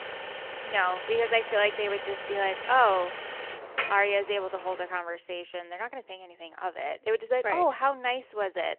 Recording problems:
phone-call audio; nothing above 3 kHz
traffic noise; loud; until 5 s; 8 dB below the speech

